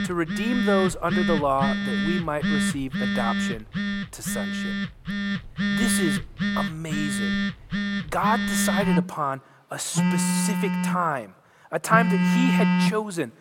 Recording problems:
alarms or sirens; very loud; throughout; 2 dB above the speech

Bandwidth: 16.5 kHz